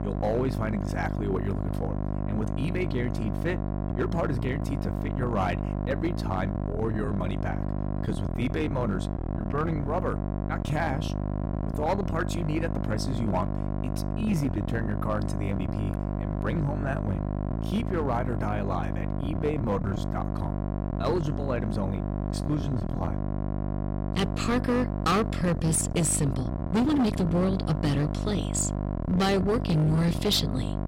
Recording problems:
distortion; slight; 12% of the sound clipped
electrical hum; loud; throughout; 50 Hz, 6 dB below the speech
uneven, jittery; strongly; from 4 to 30 s

